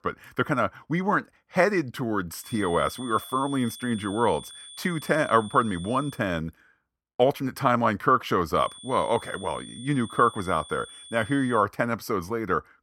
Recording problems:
high-pitched whine; noticeable; from 2.5 to 6 s and from 8.5 to 12 s; 3.5 kHz, 15 dB below the speech

